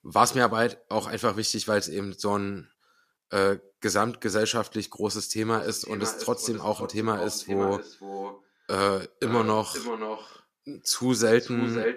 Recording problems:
echo of what is said; strong; from 5.5 s on; 530 ms later, 10 dB below the speech

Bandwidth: 14.5 kHz